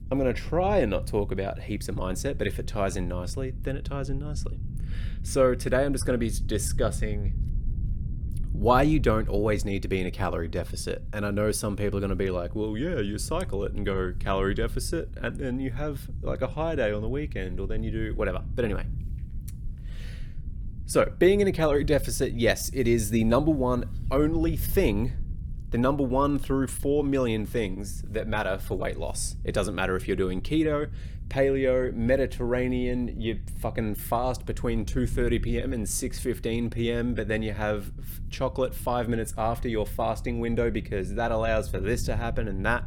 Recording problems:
low rumble; faint; throughout; 25 dB below the speech

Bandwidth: 17 kHz